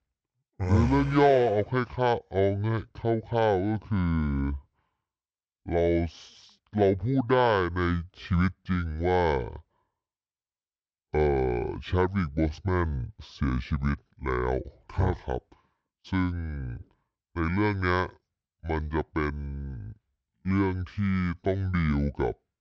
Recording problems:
wrong speed and pitch; too slow and too low; 0.6 times normal speed

